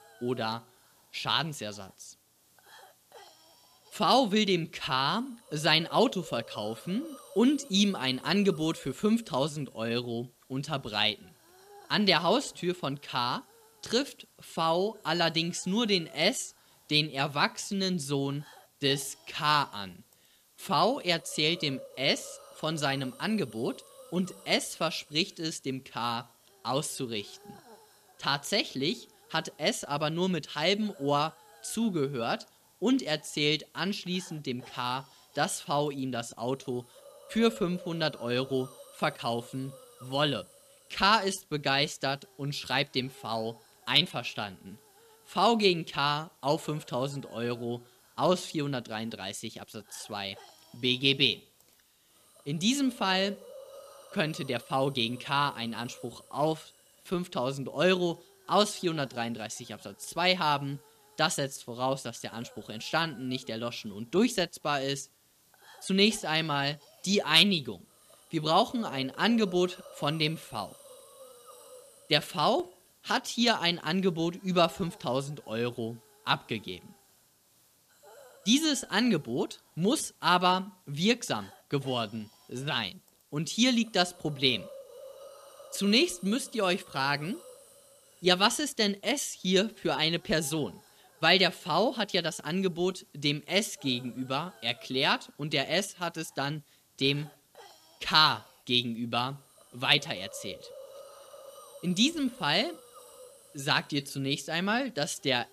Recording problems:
hiss; faint; throughout; 25 dB below the speech

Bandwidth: 14.5 kHz